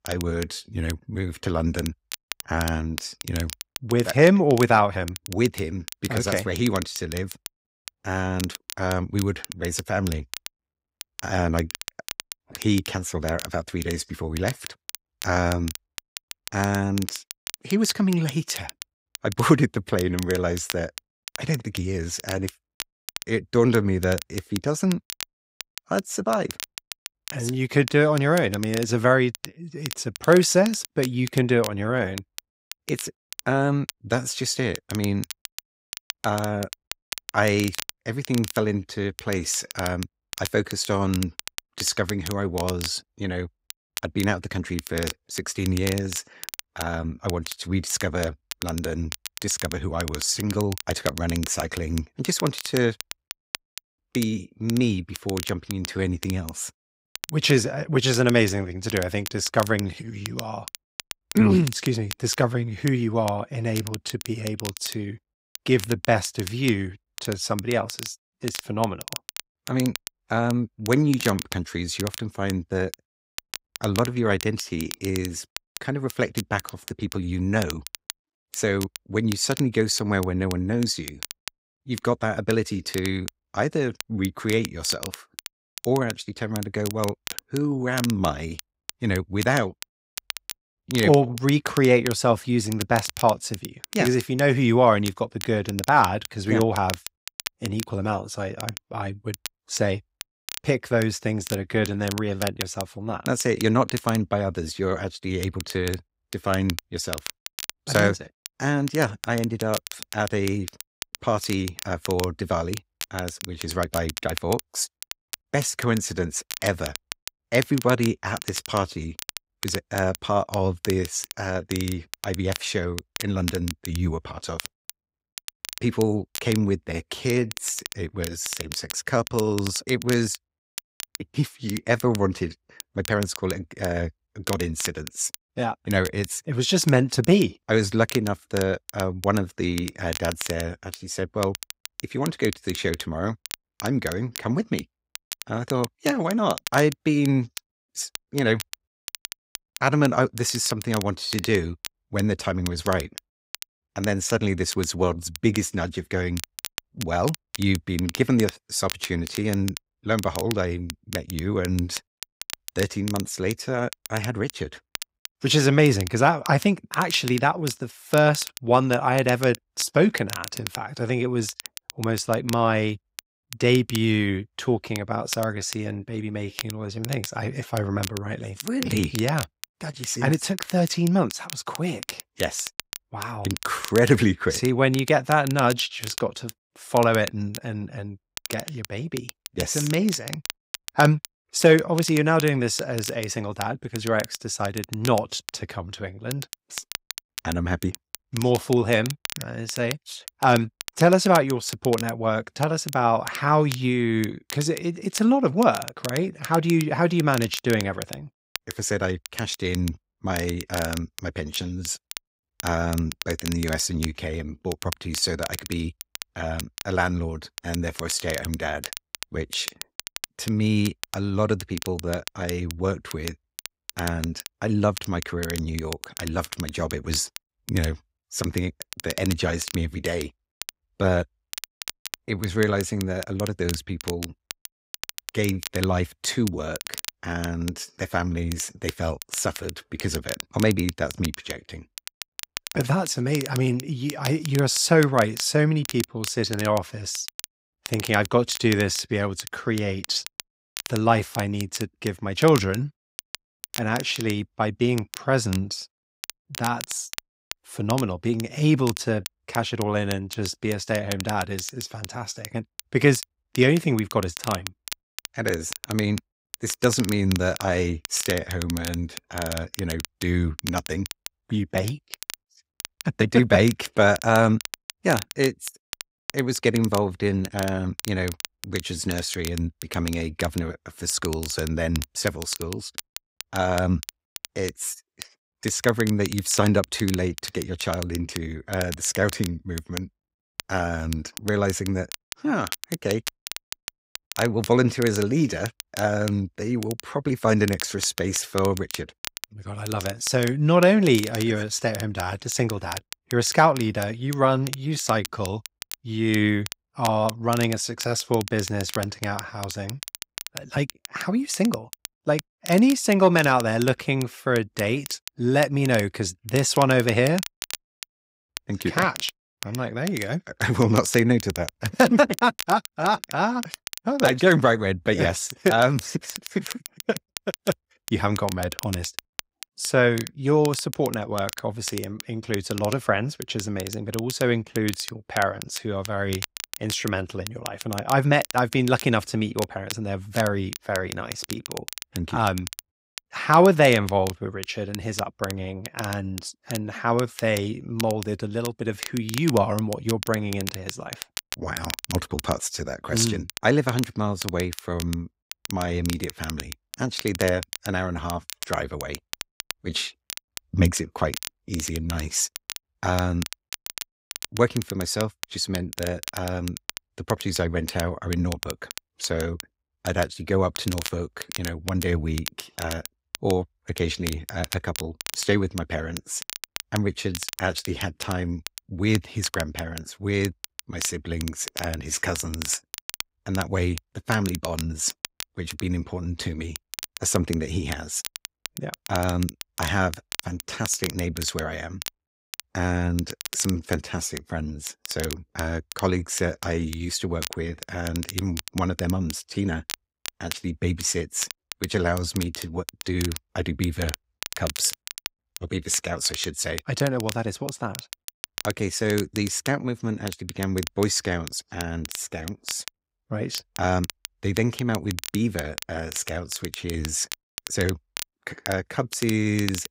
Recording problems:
crackle, like an old record; noticeable; 10 dB below the speech

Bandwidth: 15.5 kHz